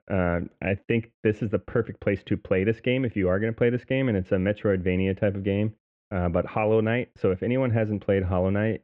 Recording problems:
muffled; very; fading above 3 kHz

